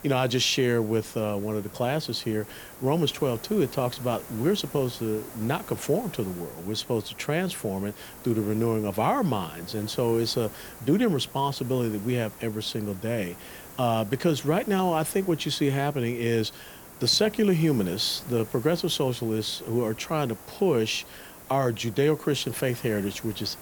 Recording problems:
hiss; noticeable; throughout; 15 dB below the speech

